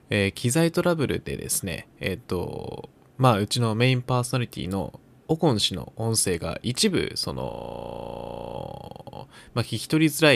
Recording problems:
audio freezing; at 7.5 s for 1 s
abrupt cut into speech; at the end

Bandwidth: 14.5 kHz